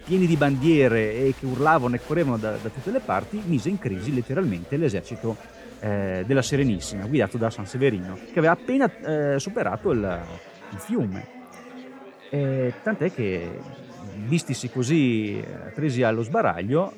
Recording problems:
chatter from many people; noticeable; throughout; 20 dB below the speech

